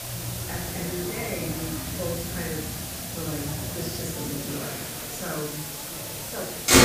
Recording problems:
off-mic speech; far
room echo; noticeable; dies away in 0.7 s
traffic noise; very loud; throughout; 2 dB above the speech
hiss; very loud; throughout; 2 dB above the speech
chatter from many people; loud; throughout; 5 dB below the speech

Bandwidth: 15 kHz